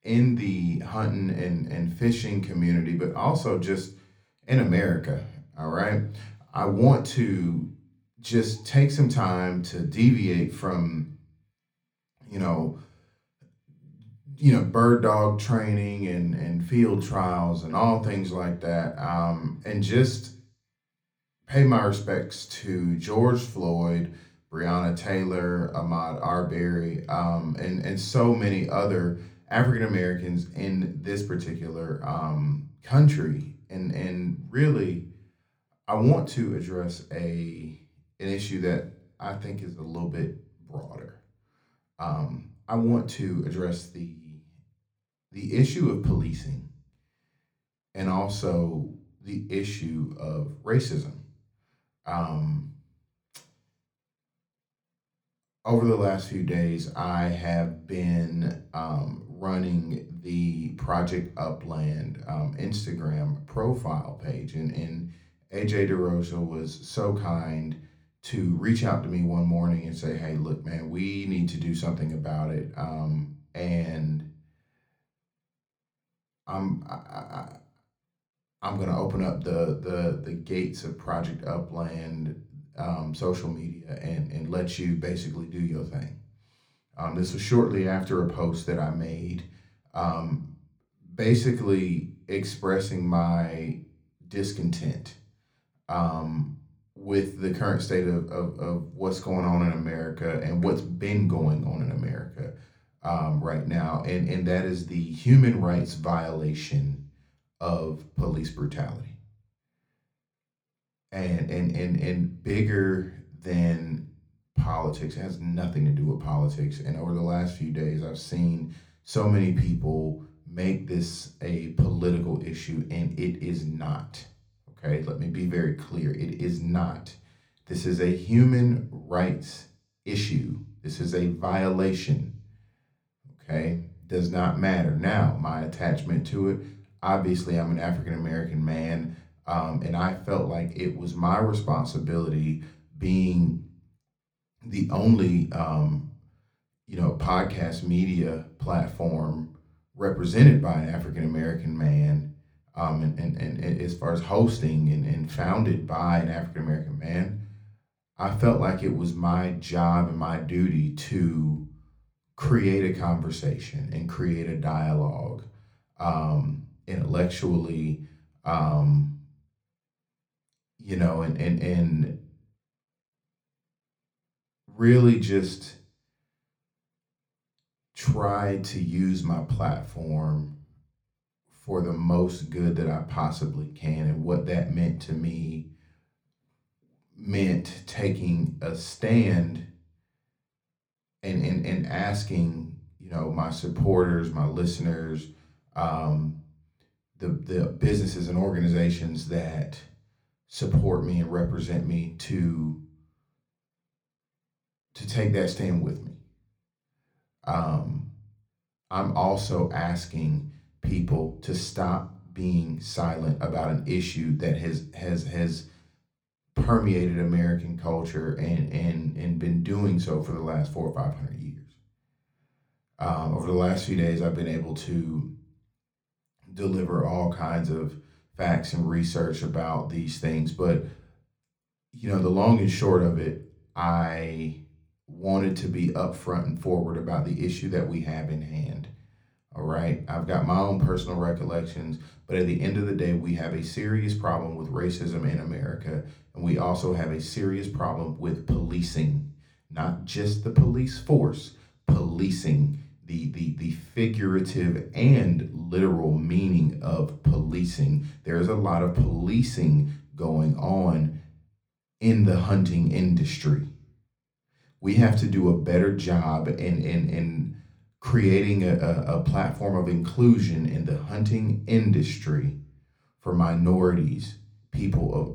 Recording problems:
room echo; very slight; dies away in 0.4 s
off-mic speech; somewhat distant

